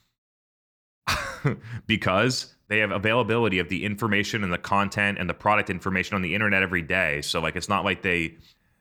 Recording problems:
none

